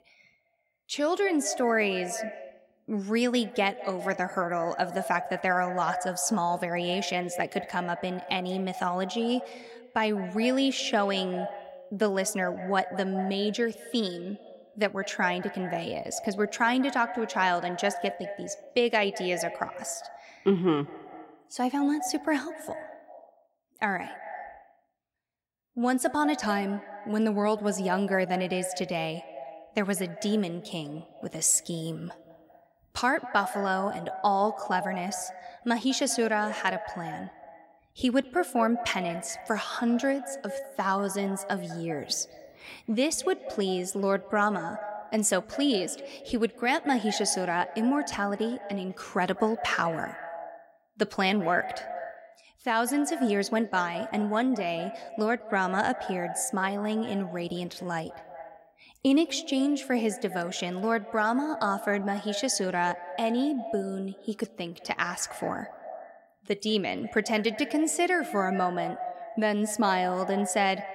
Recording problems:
echo of what is said; strong; throughout; 200 ms later, 10 dB below the speech

